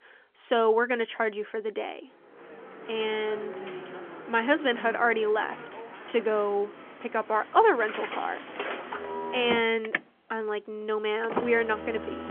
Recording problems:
phone-call audio; nothing above 3.5 kHz
traffic noise; noticeable; from 2.5 s on; 10 dB below the speech

